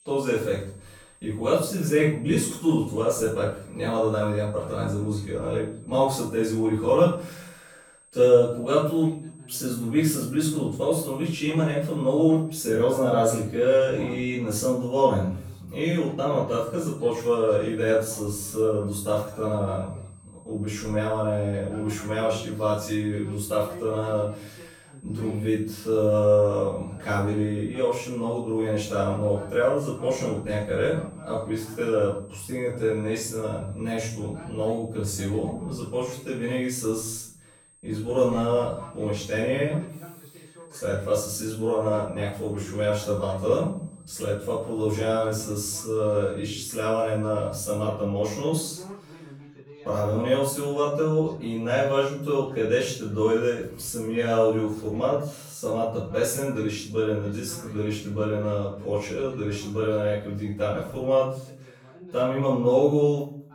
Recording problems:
off-mic speech; far
room echo; noticeable; dies away in 0.5 s
high-pitched whine; faint; until 13 s and from 17 to 48 s; 8.5 kHz, 30 dB below the speech
voice in the background; faint; throughout; 20 dB below the speech

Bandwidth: 18.5 kHz